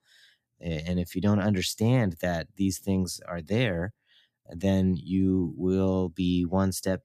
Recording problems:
none

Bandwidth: 14.5 kHz